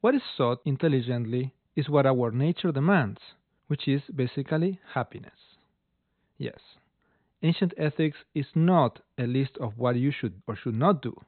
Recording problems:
high frequencies cut off; severe; nothing above 4 kHz

